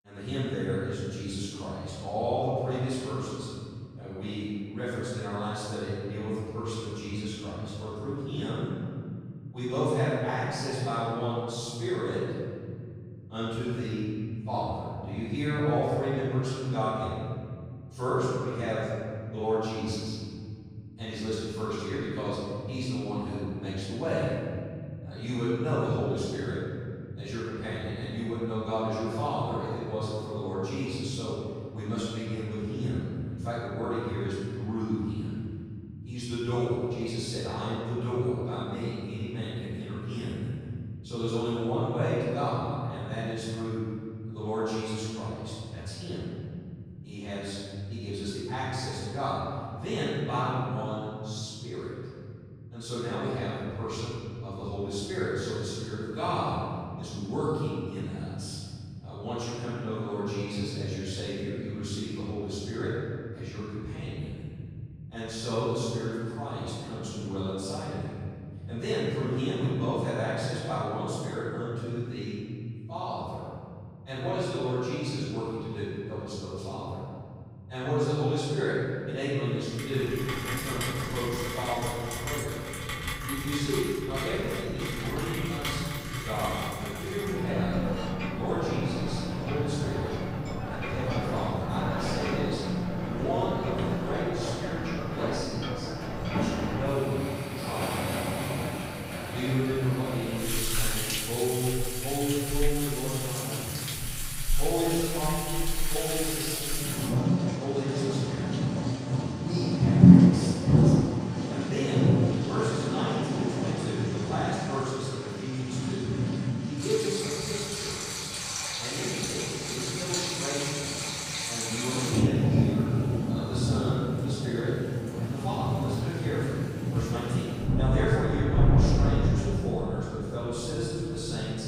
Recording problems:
room echo; strong; dies away in 3 s
off-mic speech; far
rain or running water; very loud; from 1:20 on; 3 dB above the speech

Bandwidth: 15.5 kHz